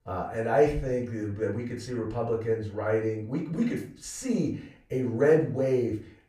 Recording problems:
off-mic speech; far
room echo; slight; dies away in 0.3 s

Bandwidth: 15 kHz